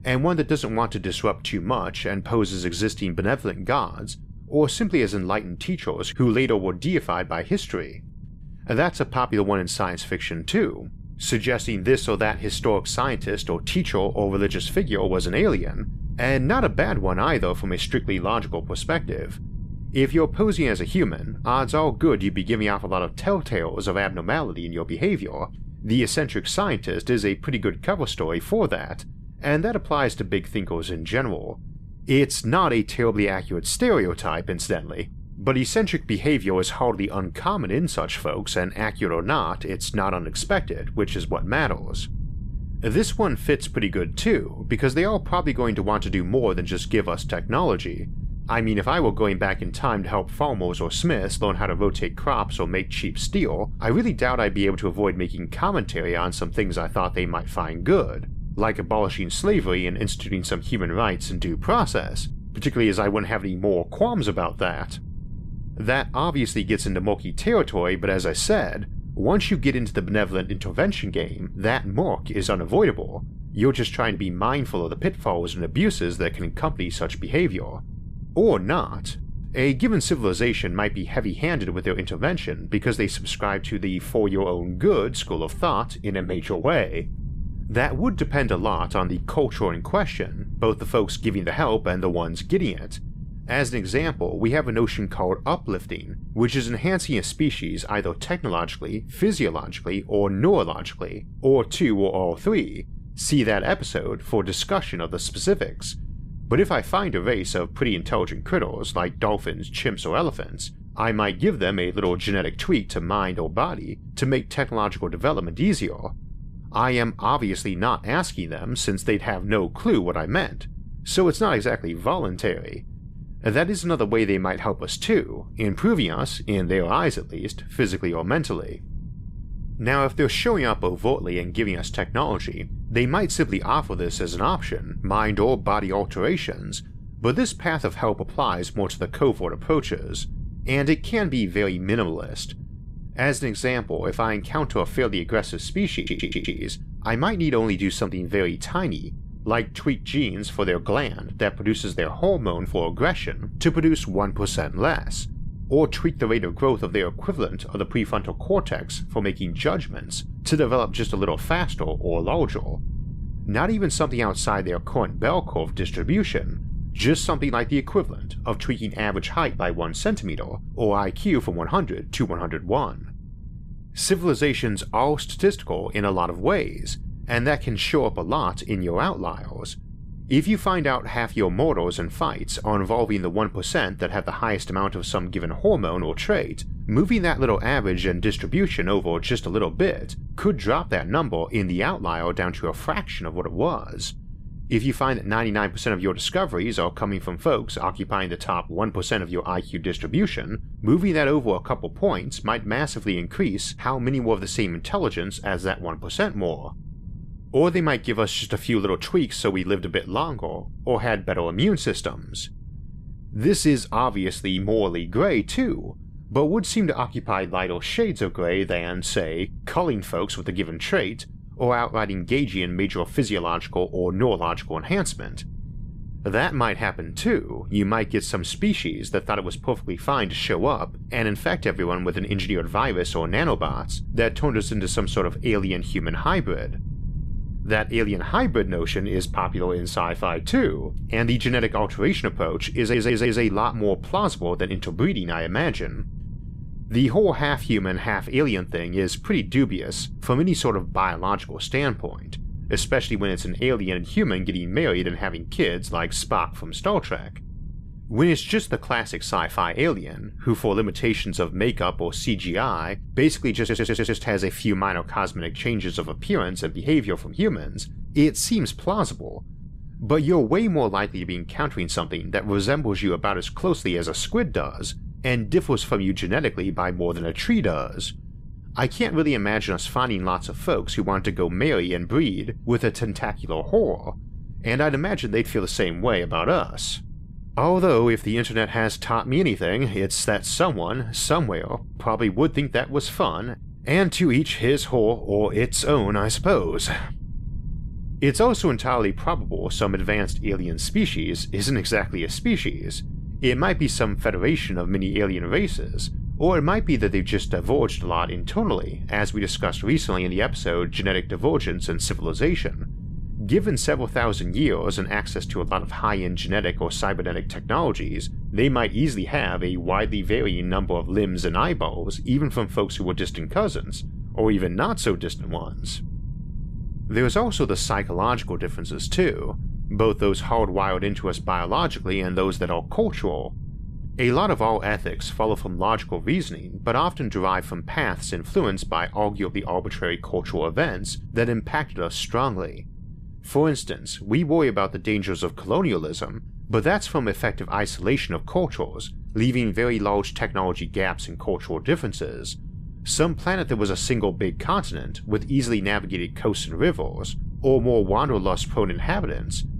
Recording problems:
low rumble; faint; throughout; 25 dB below the speech
audio stuttering; at 2:26, at 4:03 and at 4:24

